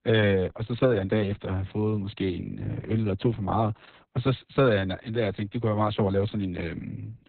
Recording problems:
garbled, watery; badly; nothing above 4 kHz

